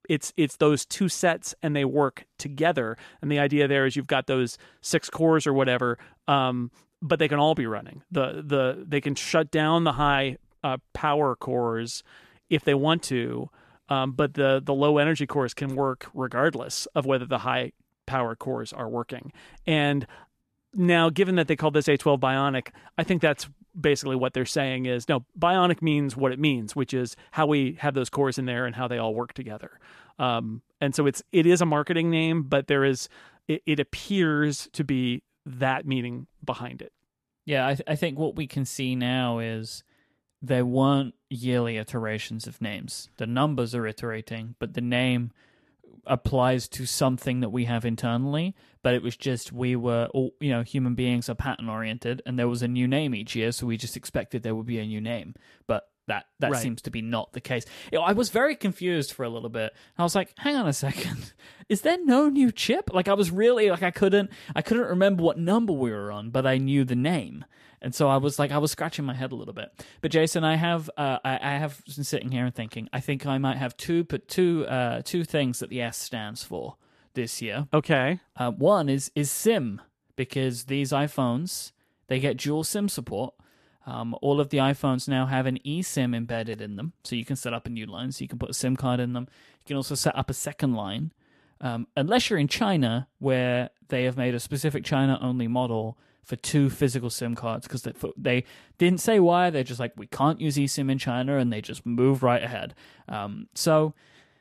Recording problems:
none

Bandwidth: 14 kHz